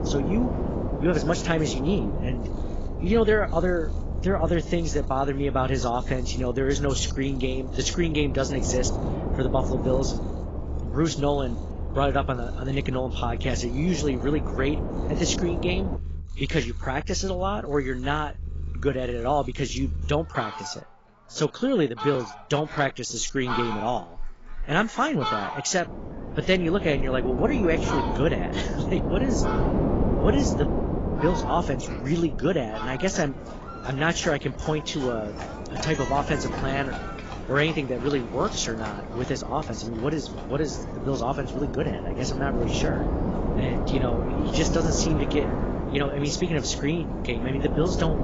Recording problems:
garbled, watery; badly; nothing above 7.5 kHz
wind noise on the microphone; heavy; until 16 s and from 26 s on; 7 dB below the speech
animal sounds; loud; throughout; 10 dB below the speech

